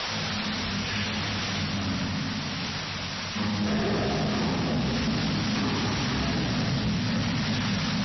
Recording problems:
room echo; strong; dies away in 3 s
off-mic speech; far
wrong speed and pitch; too slow and too low; 0.5 times normal speed
distortion; slight; 29% of the sound clipped
garbled, watery; slightly; nothing above 6 kHz
hiss; loud; throughout; 2 dB below the speech

